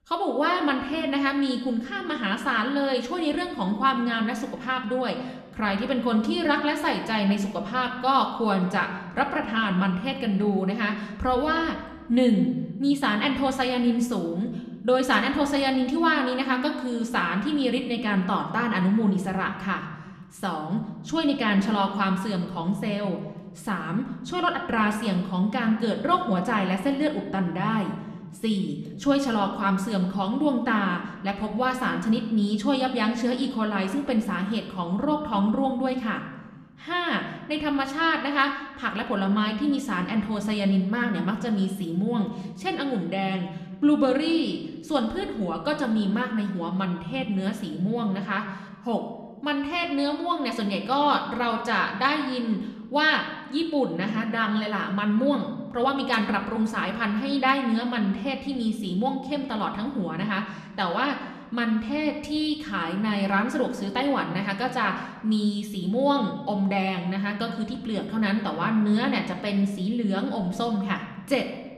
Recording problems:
room echo; slight; dies away in 1 s
off-mic speech; somewhat distant

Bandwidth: 13.5 kHz